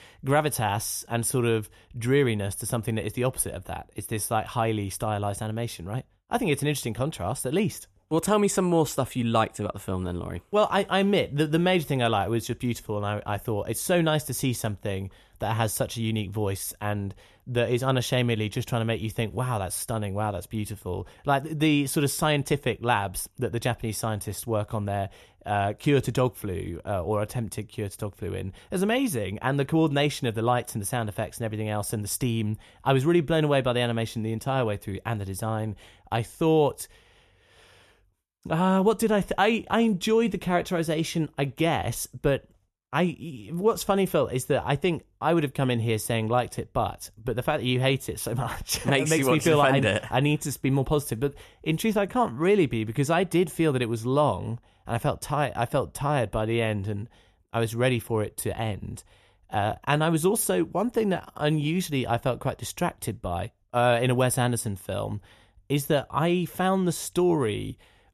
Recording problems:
none

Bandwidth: 13.5 kHz